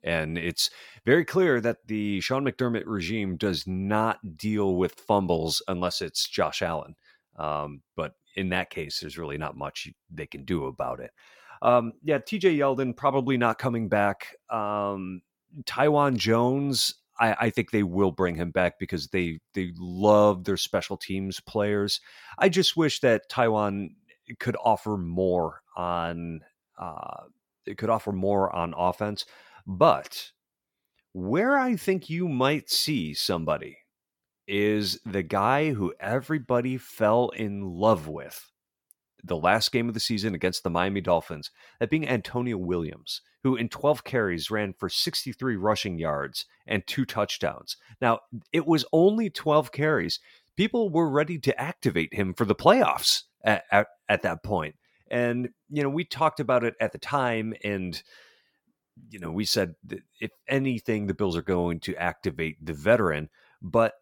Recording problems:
none

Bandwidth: 17 kHz